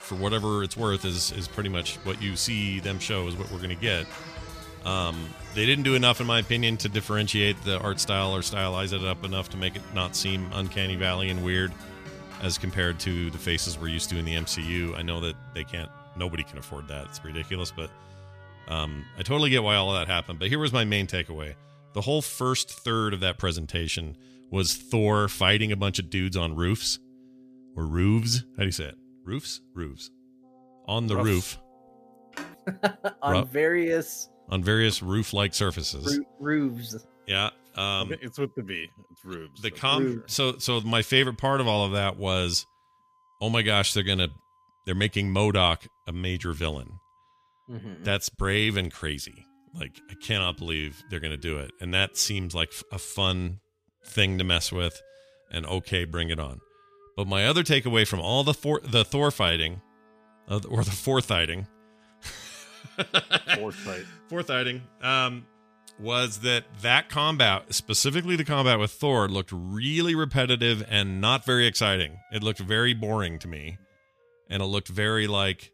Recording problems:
background music; faint; throughout; 20 dB below the speech
phone ringing; faint; at 32 s; peak 15 dB below the speech

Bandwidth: 14.5 kHz